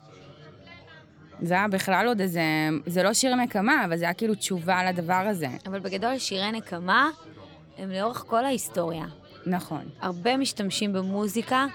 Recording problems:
background chatter; faint; throughout; 4 voices, 25 dB below the speech

